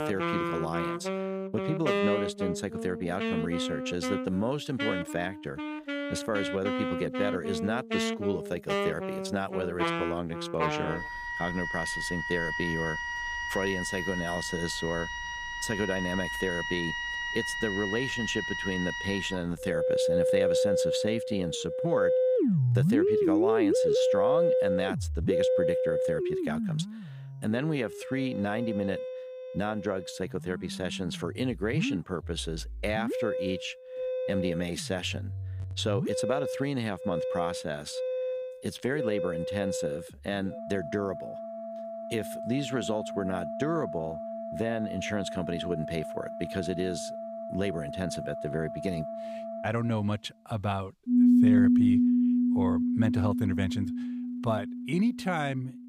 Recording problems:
background music; very loud; throughout; 3 dB above the speech

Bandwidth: 15.5 kHz